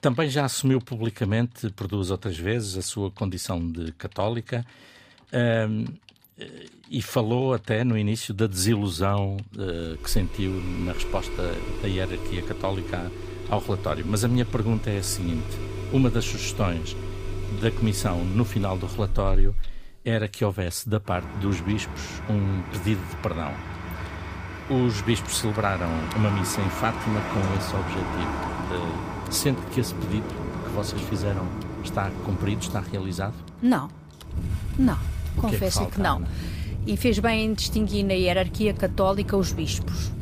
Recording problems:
traffic noise; loud; from 10 s on; 6 dB below the speech
household noises; faint; throughout; 30 dB below the speech

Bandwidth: 15 kHz